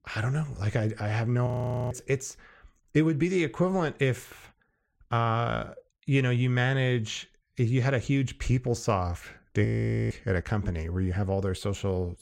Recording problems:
audio freezing; at 1.5 s and at 9.5 s

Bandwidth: 16 kHz